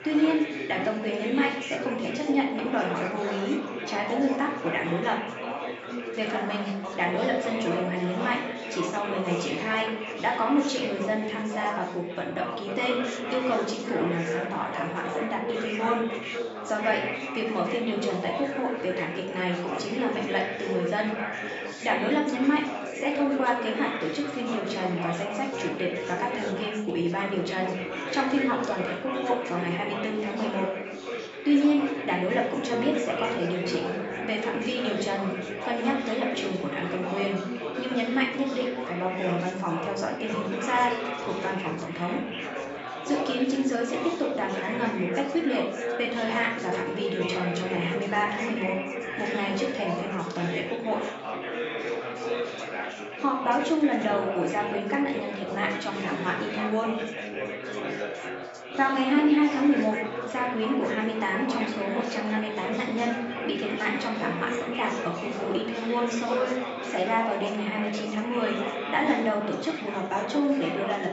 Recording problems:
off-mic speech; far
high frequencies cut off; noticeable; nothing above 8 kHz
room echo; slight; dies away in 0.6 s
thin; very slightly; fading below 1 kHz
chatter from many people; loud; throughout; 5 dB below the speech
background music; noticeable; throughout; 15 dB below the speech

